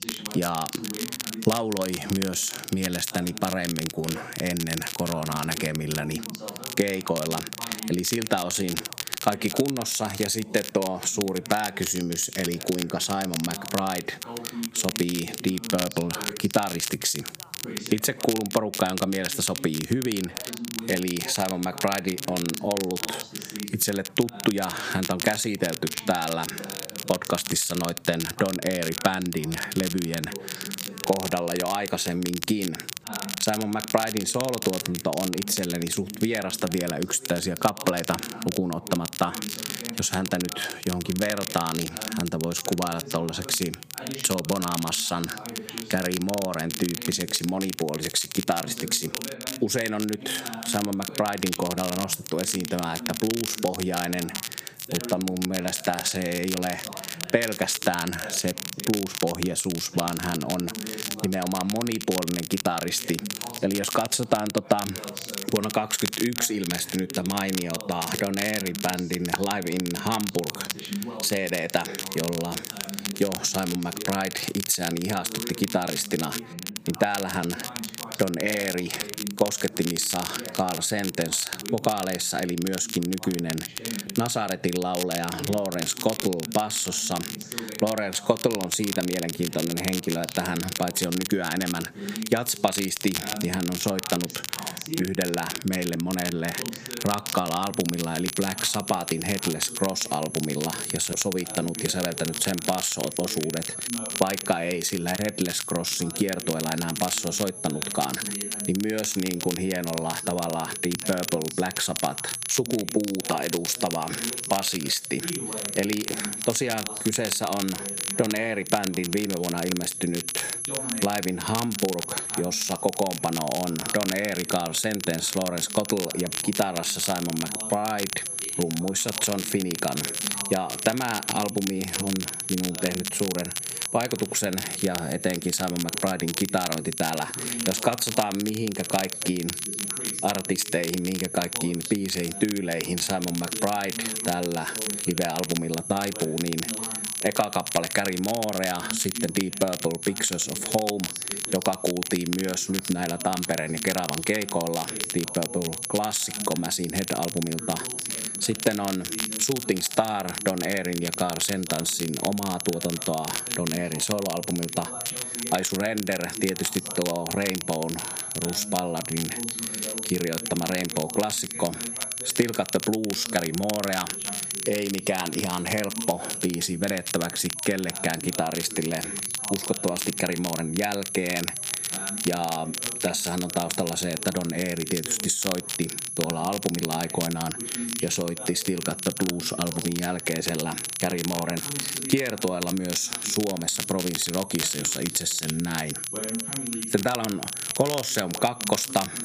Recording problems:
squashed, flat; somewhat, background pumping
high-pitched whine; loud; from 1:38 on; 11 kHz, 8 dB below the speech
crackle, like an old record; loud; 5 dB below the speech
background chatter; noticeable; throughout; 2 voices, 15 dB below the speech

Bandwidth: 15 kHz